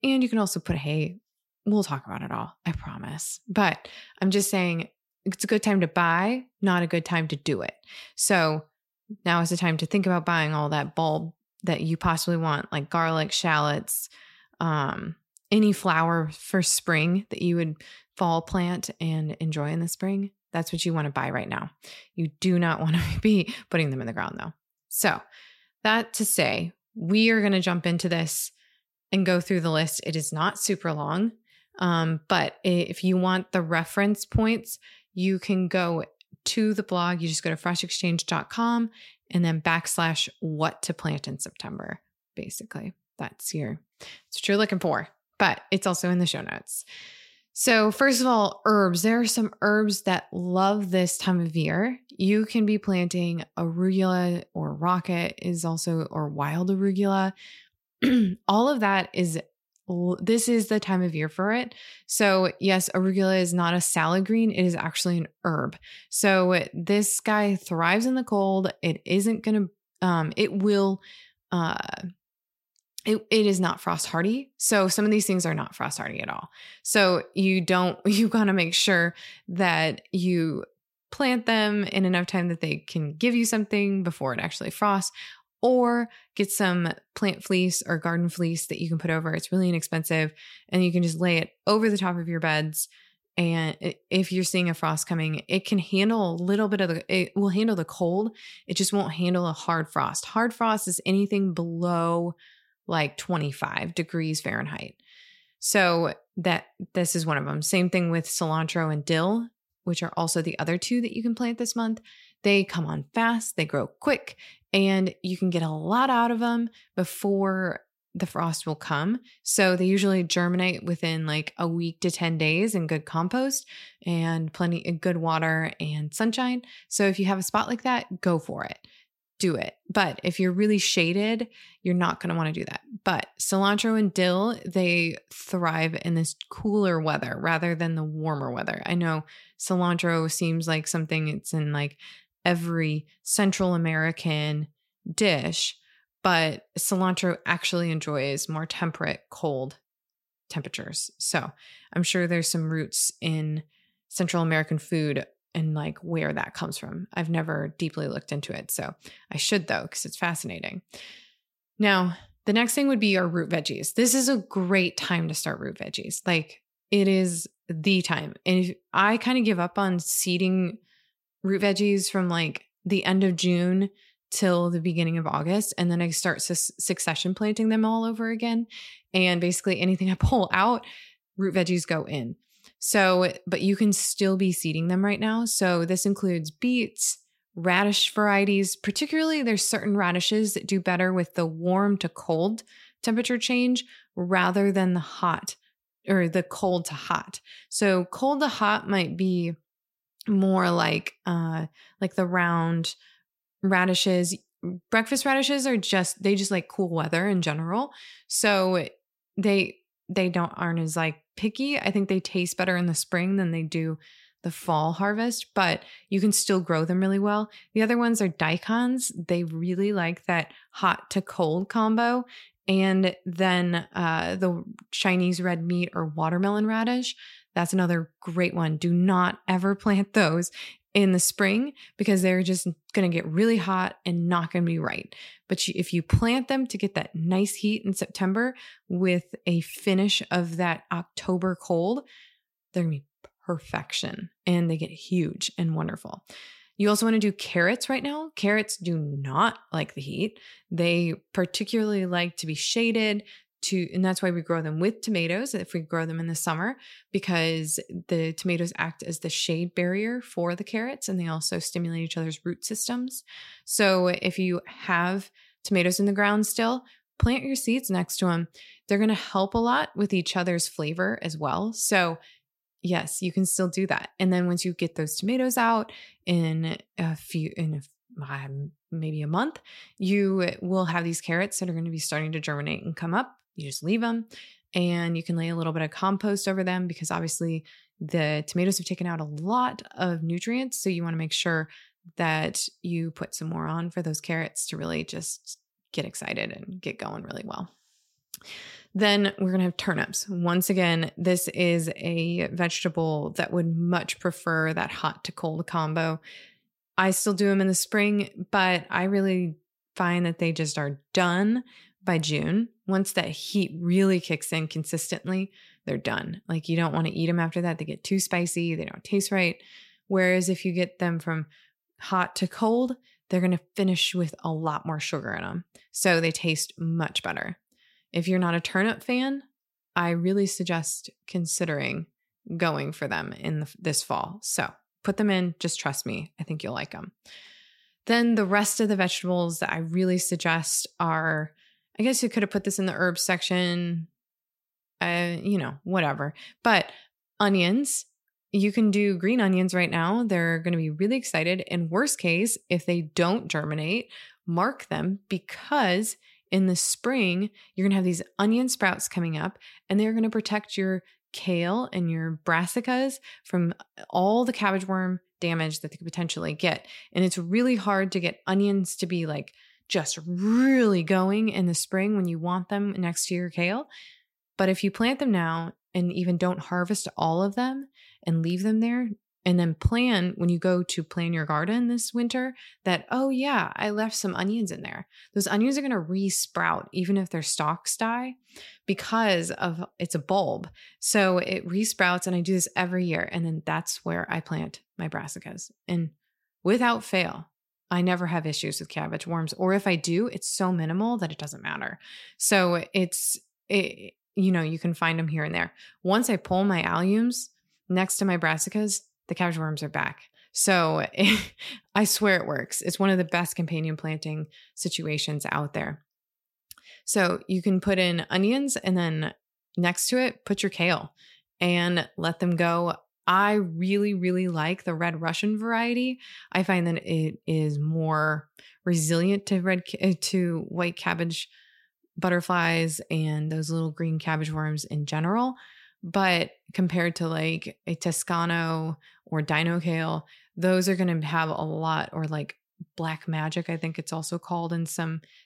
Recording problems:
none

